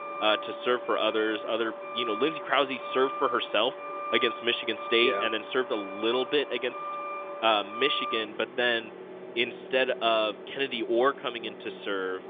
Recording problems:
phone-call audio; nothing above 3.5 kHz
traffic noise; loud; throughout; 9 dB below the speech

